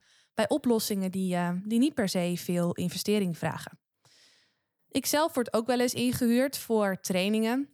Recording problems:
none

